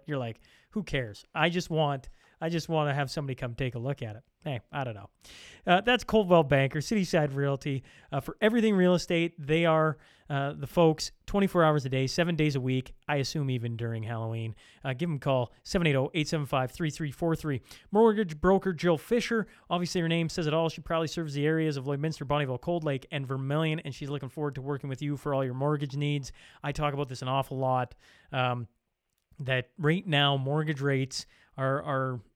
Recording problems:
none

